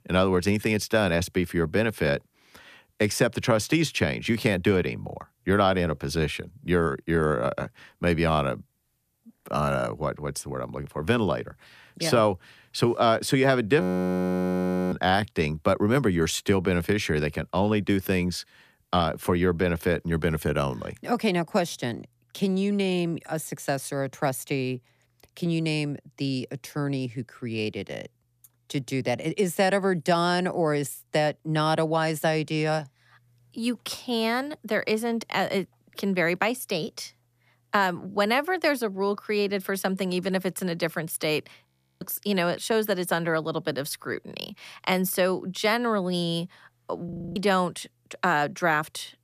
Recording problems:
audio freezing; at 14 s for 1 s, at 42 s and at 47 s

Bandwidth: 14.5 kHz